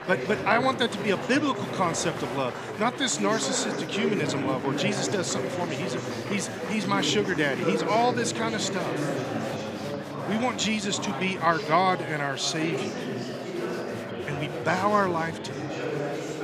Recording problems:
chatter from many people; loud; throughout; 5 dB below the speech

